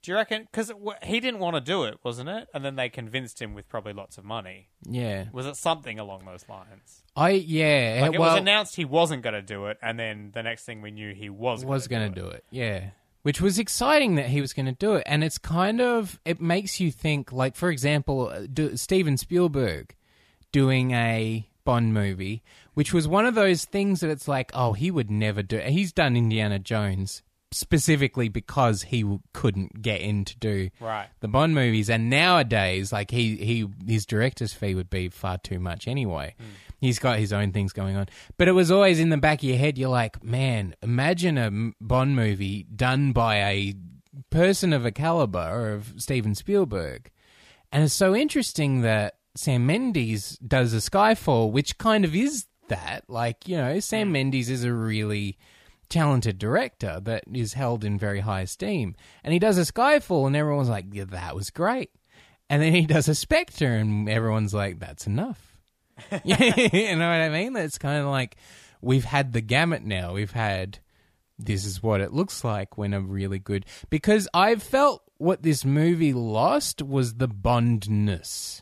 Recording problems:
none

